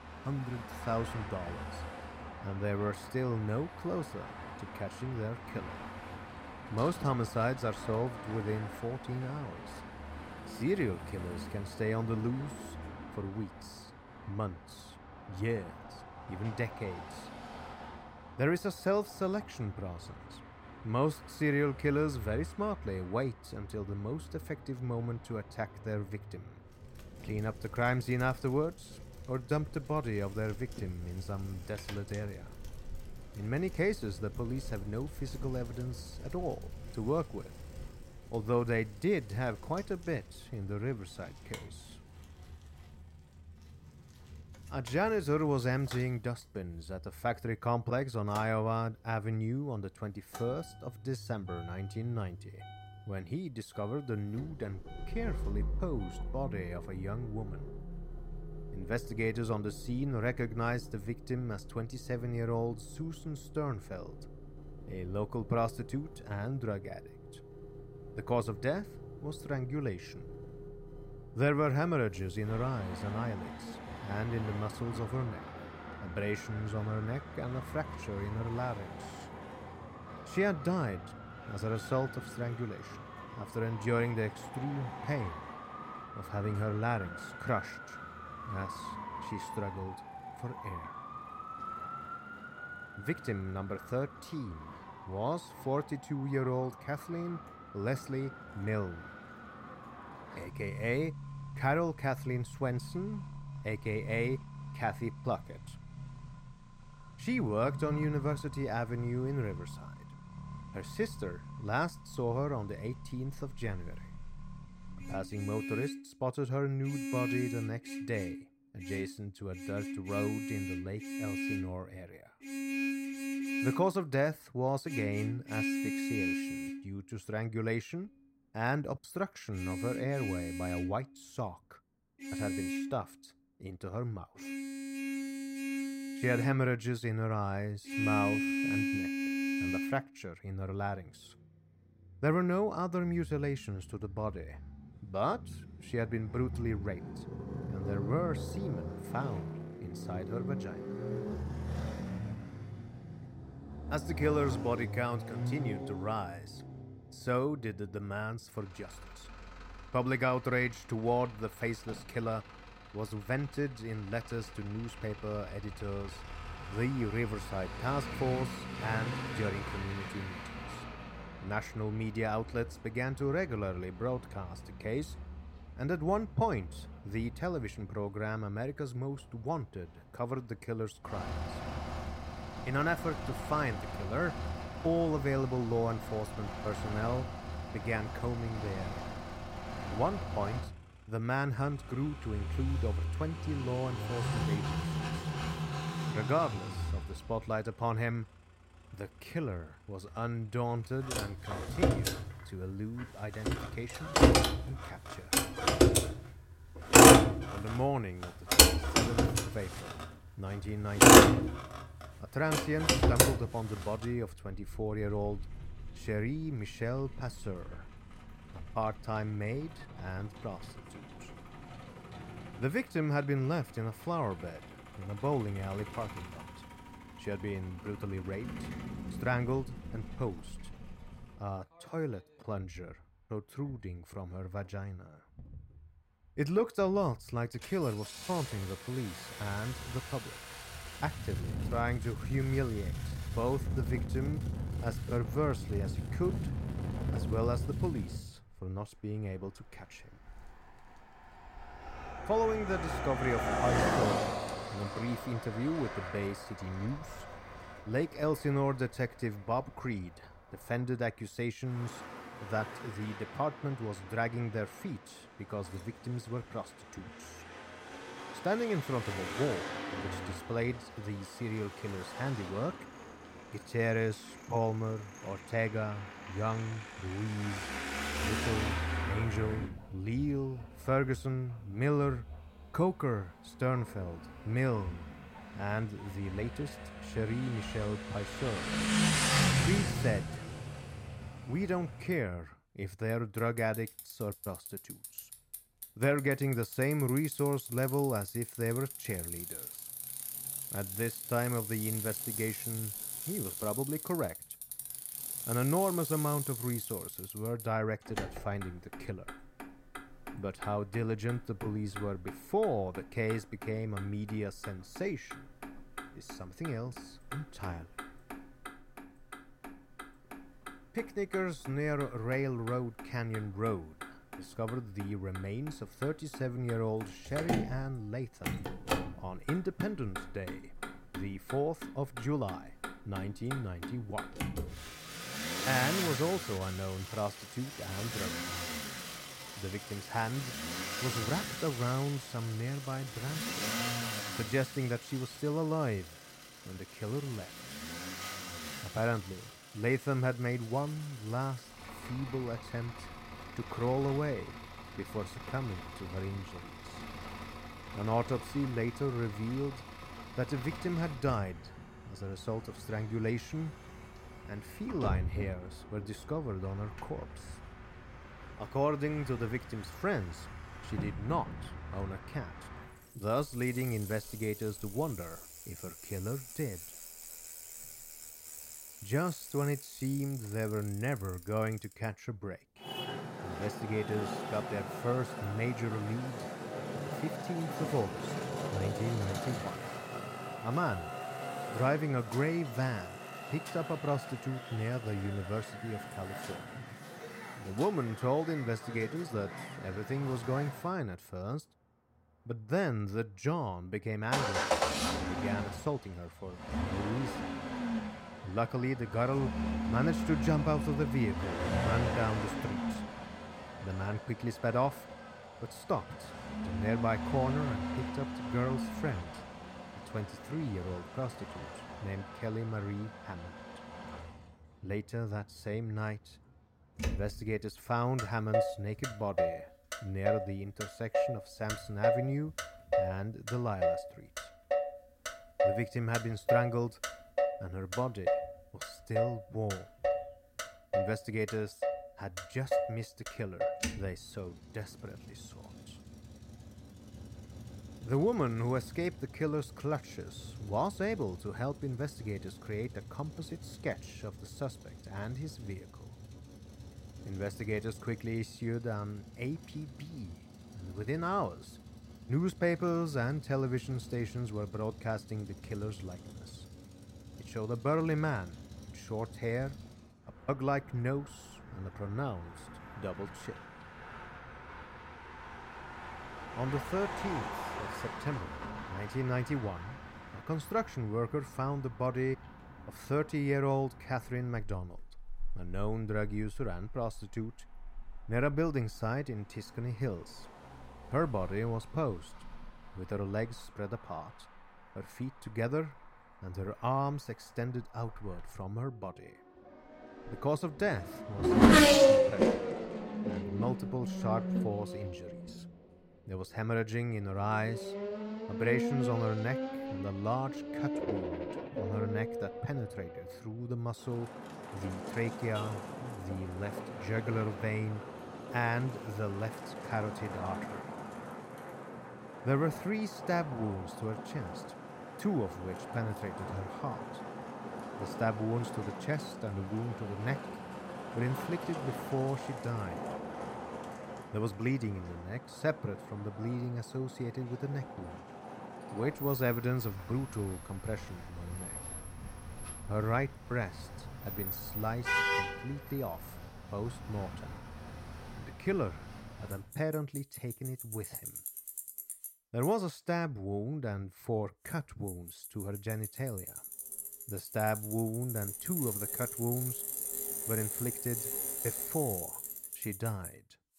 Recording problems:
traffic noise; loud; throughout; 1 dB below the speech

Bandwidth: 16 kHz